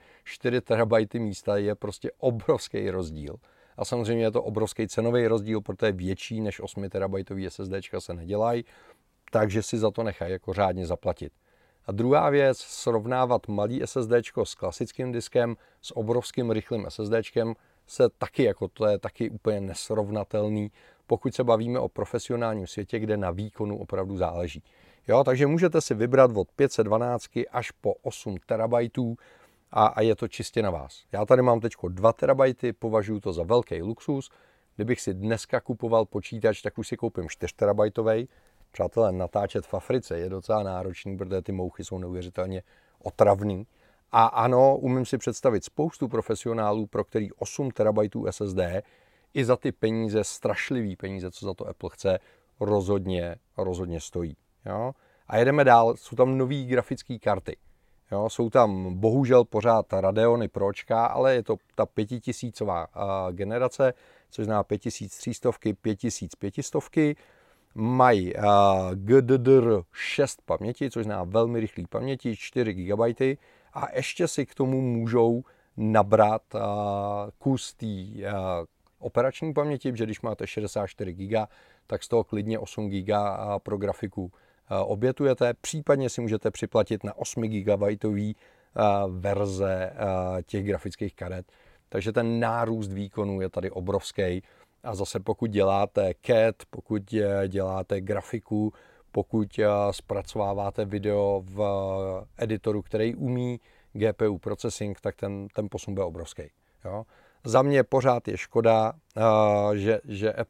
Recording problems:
none

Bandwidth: 16 kHz